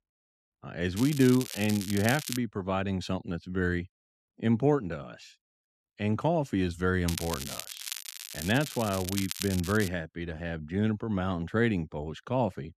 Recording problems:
crackling; loud; from 1 to 2.5 s and from 7 to 10 s; 8 dB below the speech

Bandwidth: 14 kHz